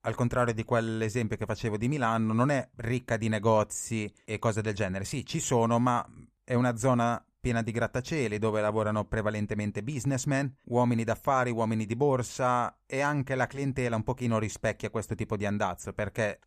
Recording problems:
none

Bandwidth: 15 kHz